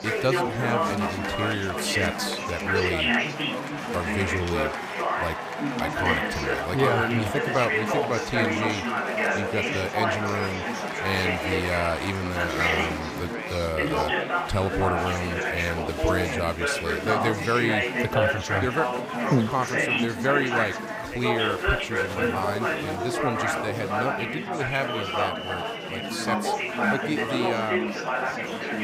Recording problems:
chatter from many people; very loud; throughout; 2 dB above the speech

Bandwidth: 15.5 kHz